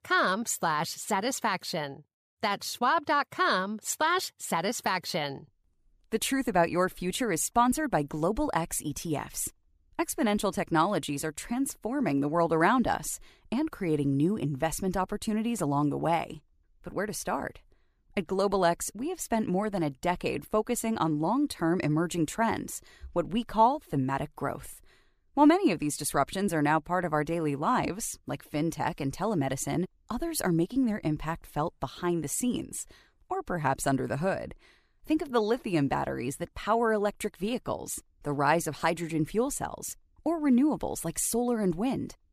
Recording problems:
none

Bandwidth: 14.5 kHz